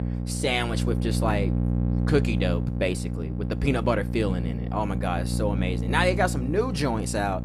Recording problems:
electrical hum; loud; throughout; 60 Hz, 10 dB below the speech

